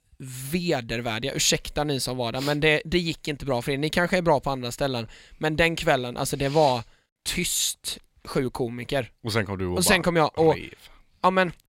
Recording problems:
none

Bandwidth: 16 kHz